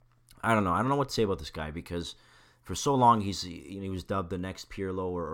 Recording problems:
abrupt cut into speech; at the end

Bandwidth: 16.5 kHz